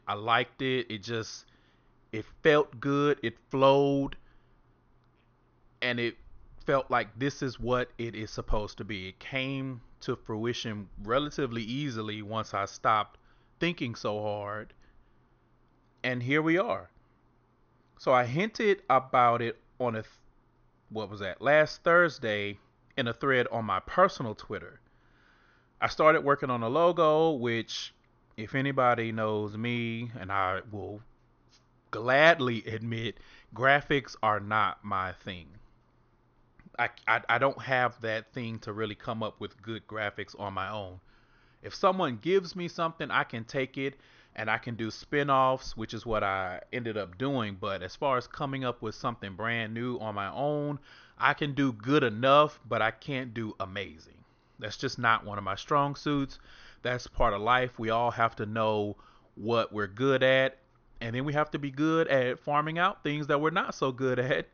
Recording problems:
high frequencies cut off; noticeable; nothing above 6.5 kHz

